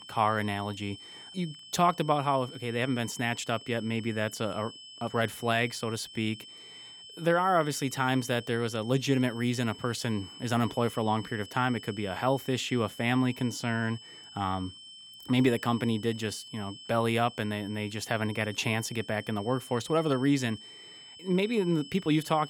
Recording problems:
high-pitched whine; noticeable; throughout; 3 kHz, 15 dB below the speech

